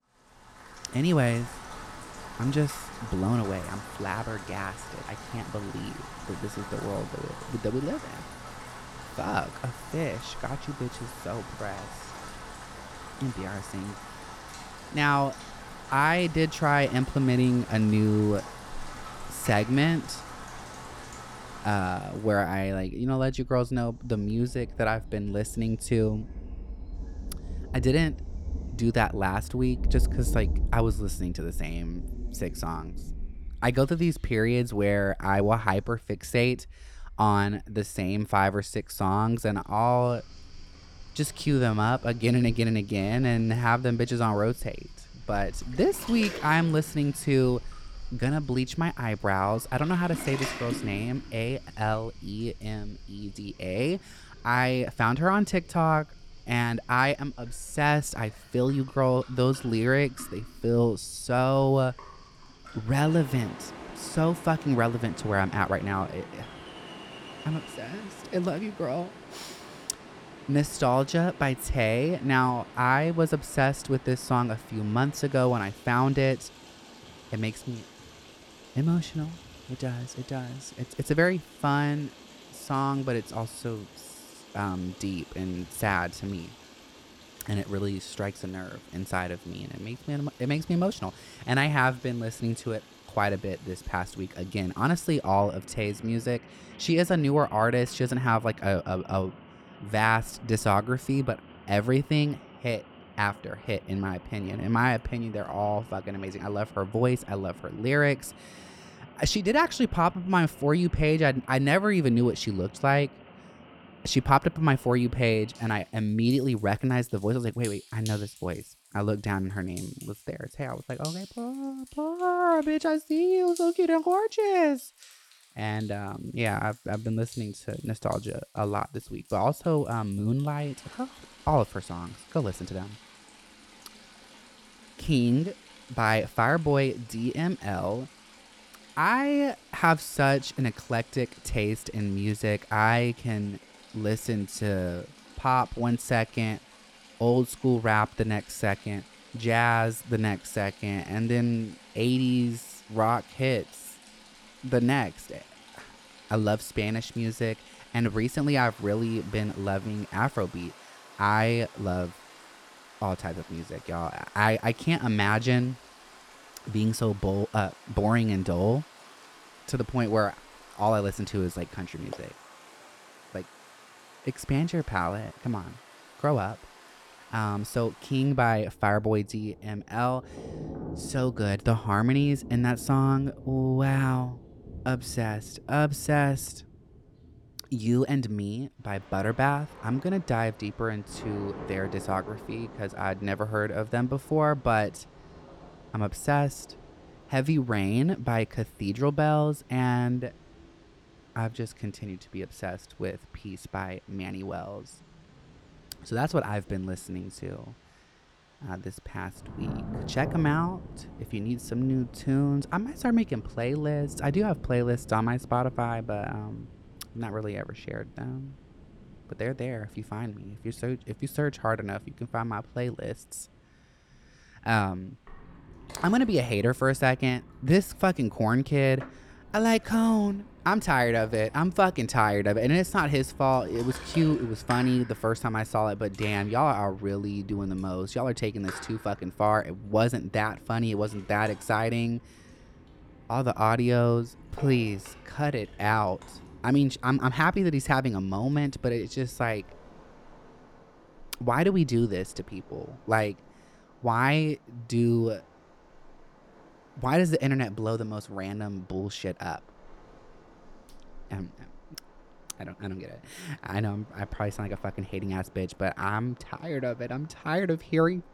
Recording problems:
rain or running water; noticeable; throughout; 15 dB below the speech

